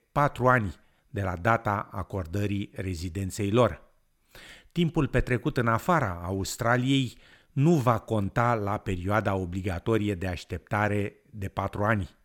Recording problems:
none

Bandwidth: 17 kHz